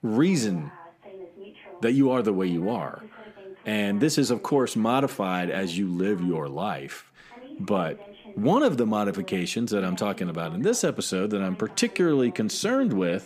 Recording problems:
voice in the background; faint; throughout; 20 dB below the speech

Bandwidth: 15 kHz